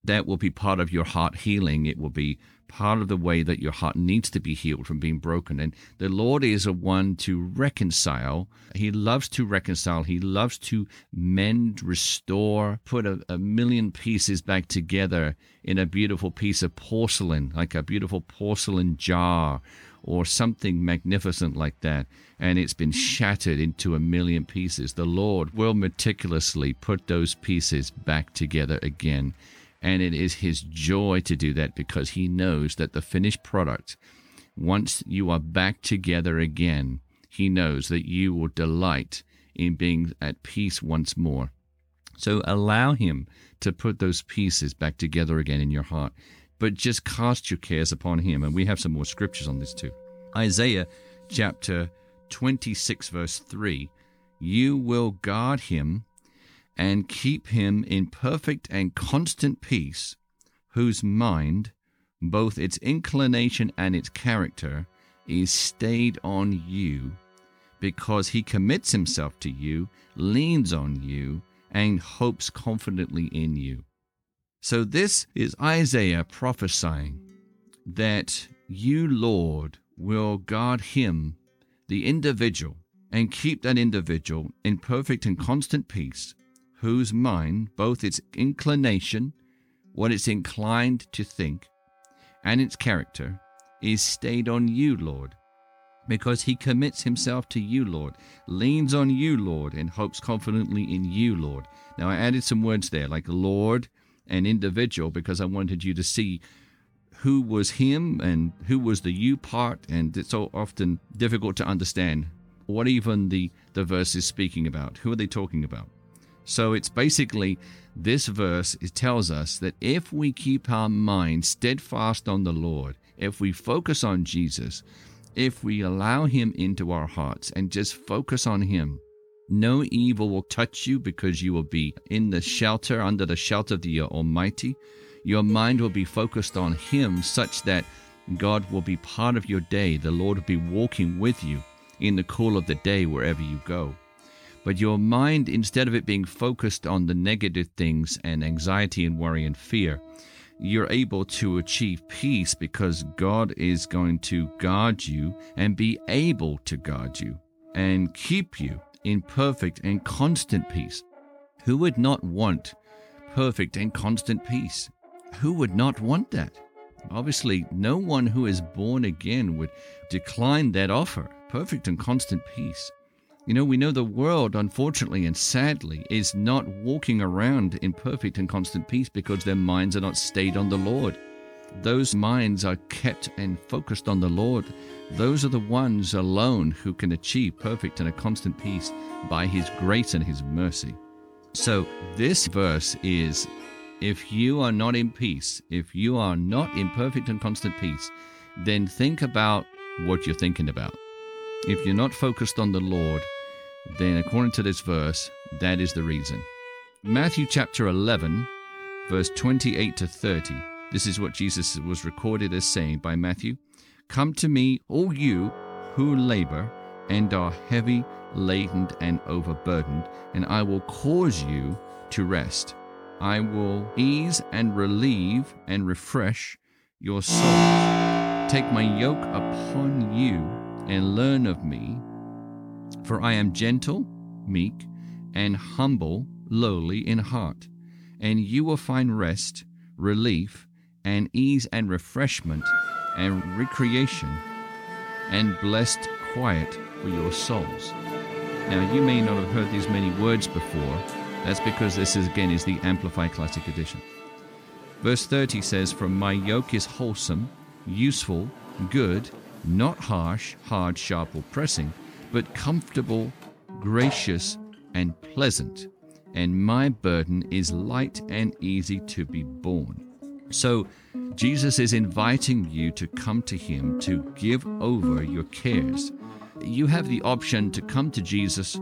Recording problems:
background music; loud; throughout; 10 dB below the speech

